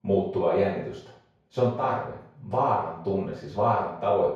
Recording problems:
off-mic speech; far
room echo; noticeable; dies away in 0.6 s

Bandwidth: 13.5 kHz